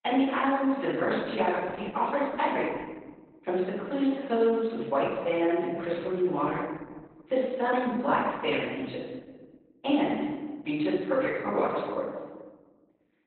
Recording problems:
off-mic speech; far
garbled, watery; badly; nothing above 4 kHz
room echo; noticeable; dies away in 1.4 s
thin; very slightly; fading below 350 Hz

